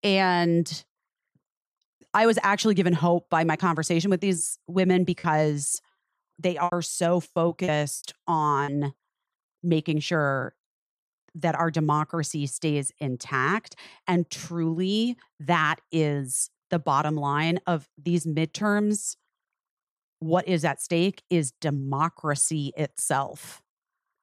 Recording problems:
choppy; very; from 5 to 8.5 s; 10% of the speech affected

